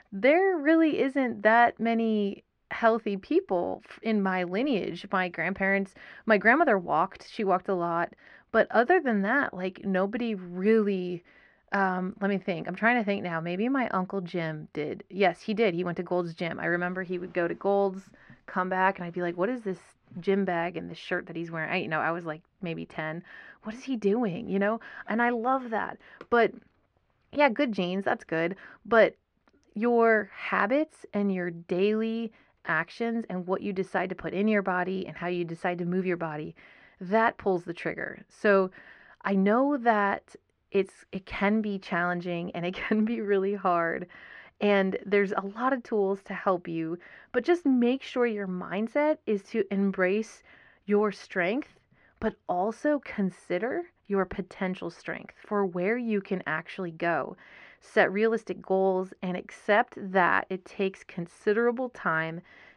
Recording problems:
muffled; slightly; fading above 2.5 kHz

